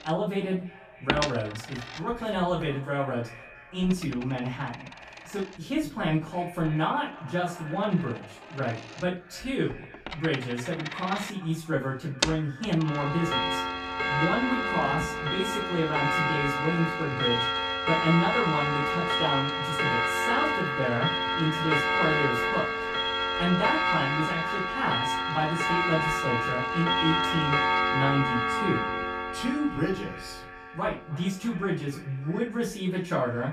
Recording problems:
off-mic speech; far
echo of what is said; faint; throughout; 300 ms later, 20 dB below the speech
room echo; slight; dies away in 0.3 s
household noises; very loud; throughout; 3 dB above the speech

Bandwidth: 15 kHz